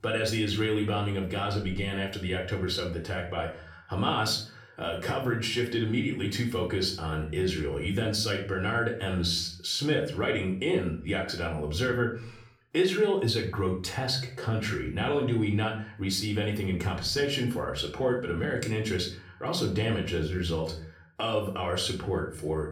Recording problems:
off-mic speech; far
room echo; slight; dies away in 0.4 s

